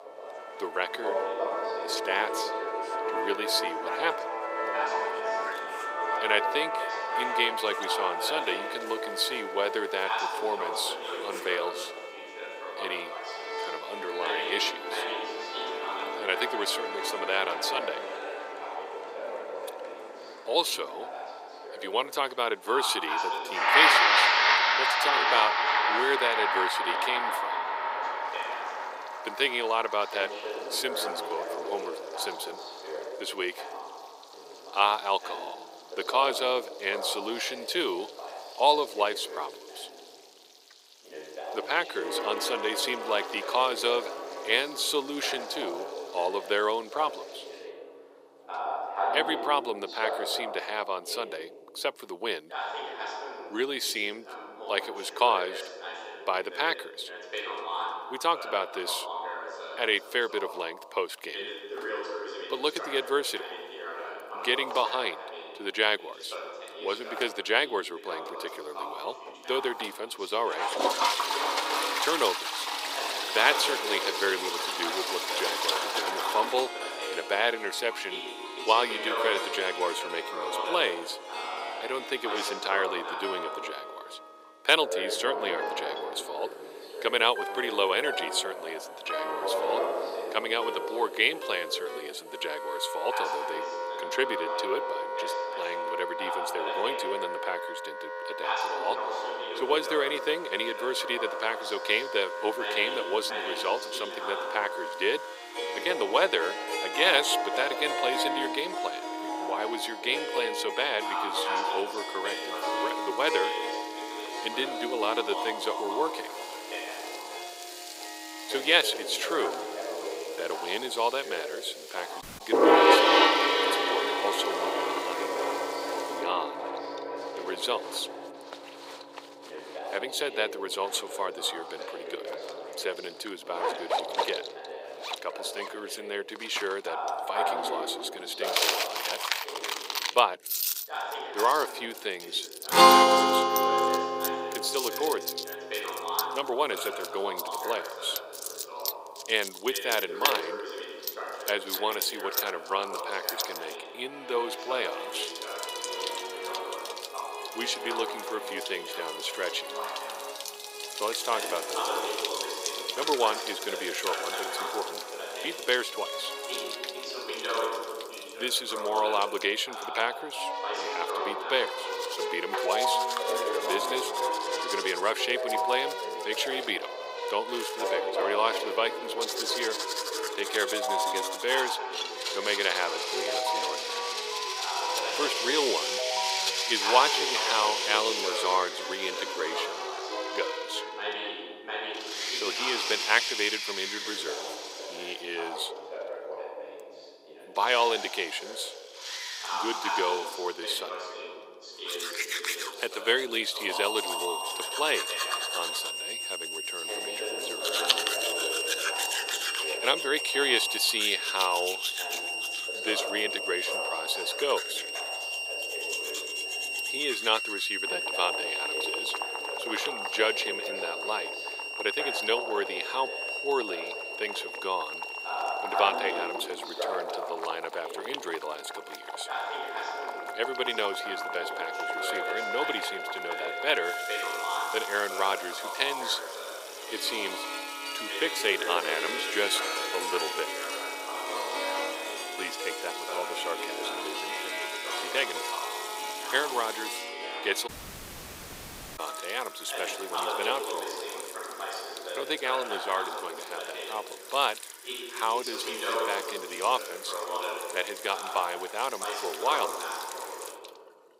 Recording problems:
thin; very; fading below 400 Hz
household noises; loud; throughout; 5 dB below the speech
background music; loud; throughout; 1 dB below the speech
voice in the background; loud; throughout; 7 dB below the speech
audio cutting out; at 2:02 and at 4:08 for 1.5 s

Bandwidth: 15.5 kHz